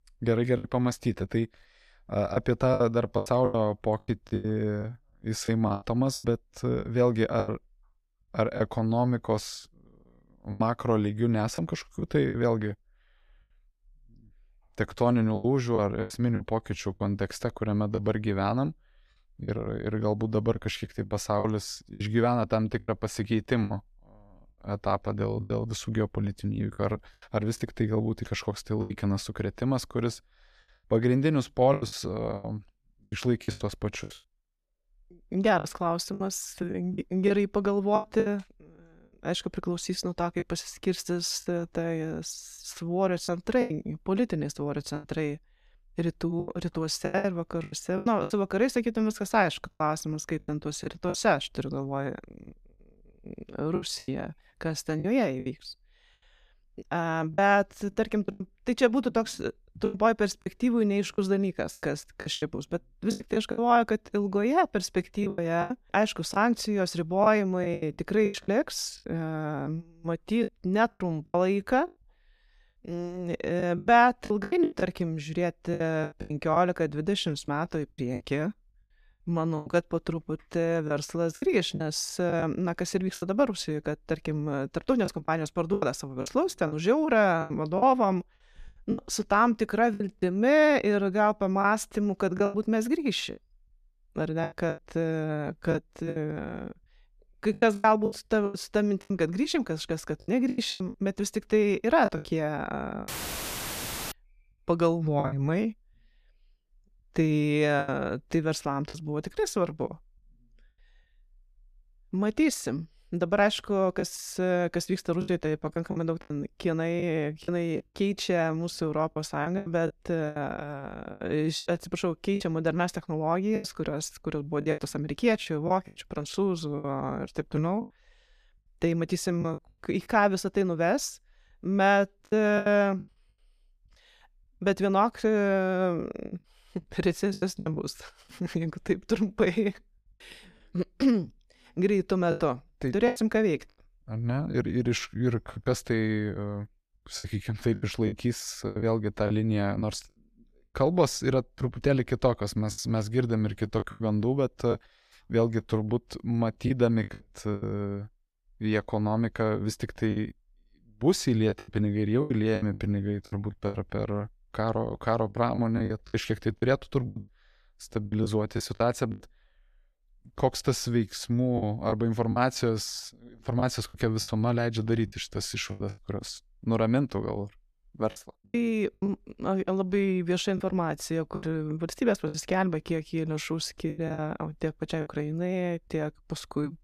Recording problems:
choppy; very; 9% of the speech affected
audio cutting out; filled with static; at 1:43 for 1 s

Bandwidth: 14.5 kHz